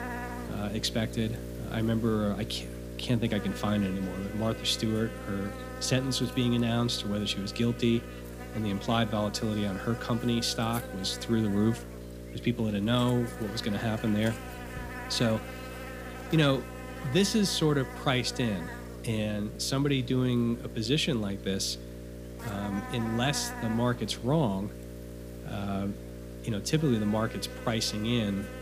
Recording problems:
electrical hum; loud; throughout; 60 Hz, 10 dB below the speech

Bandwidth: 15 kHz